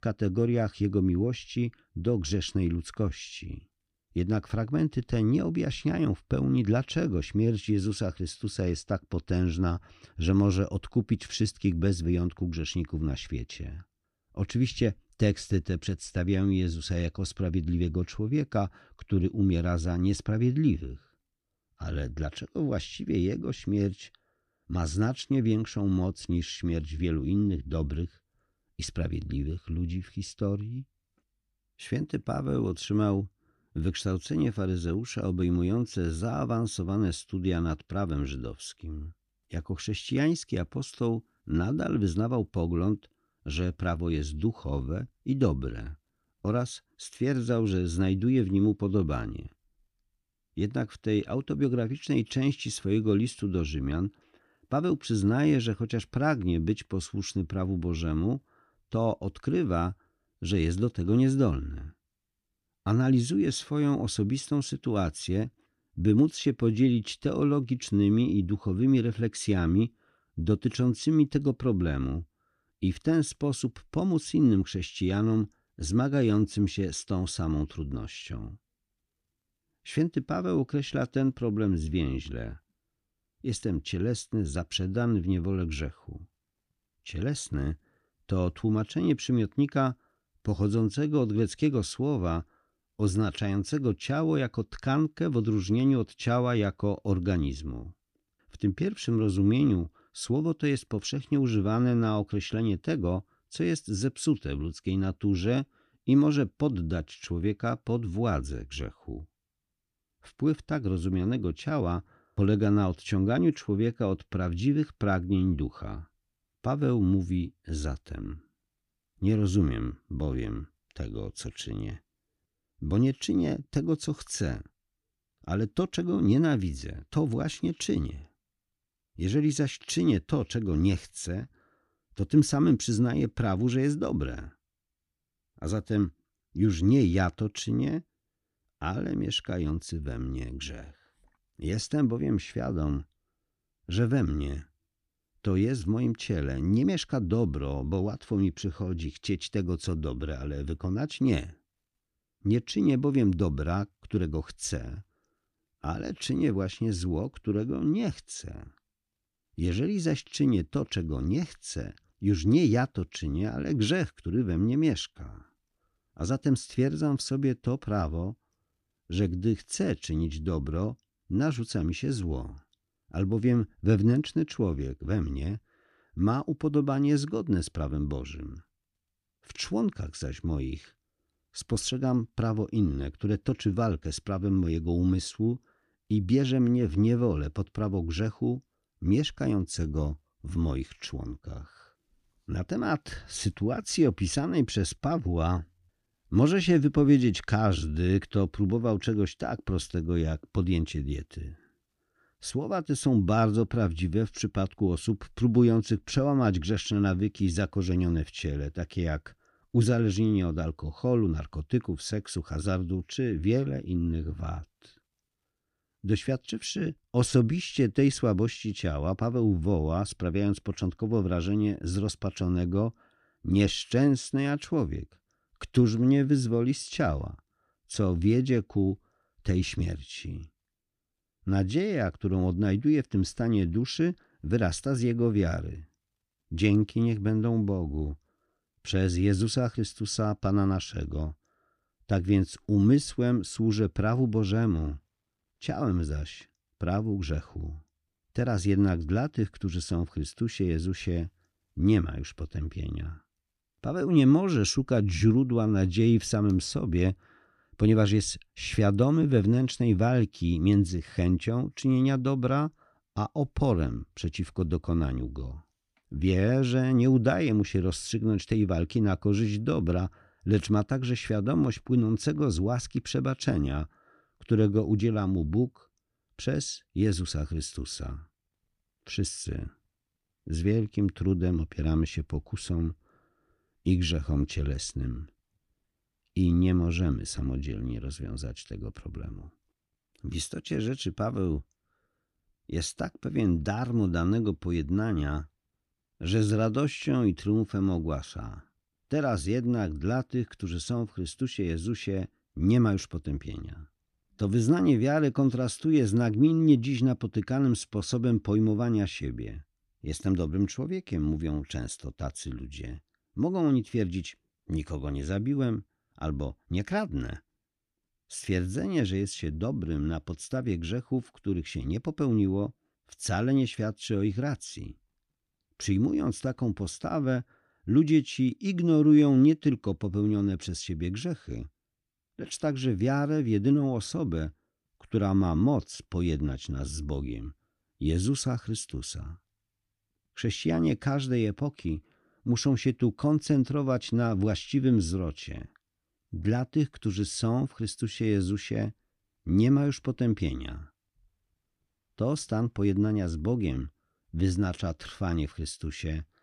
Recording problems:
none

